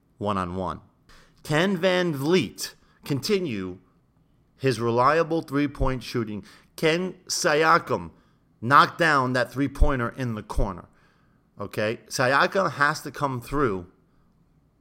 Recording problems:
none

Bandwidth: 16 kHz